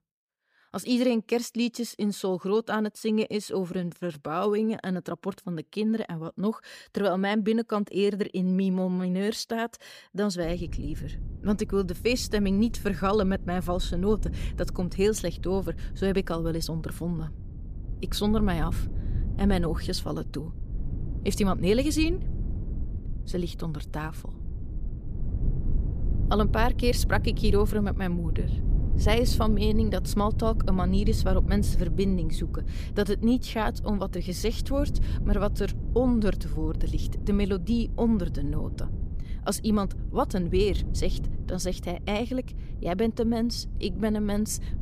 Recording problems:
low rumble; noticeable; from 10 s on; 15 dB below the speech

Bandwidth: 15 kHz